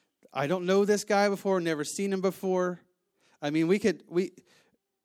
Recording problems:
none

